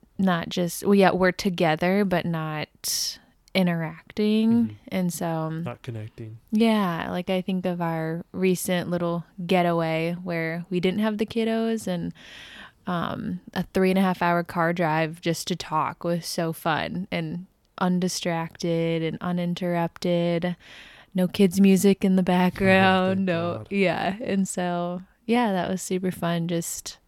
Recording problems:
none

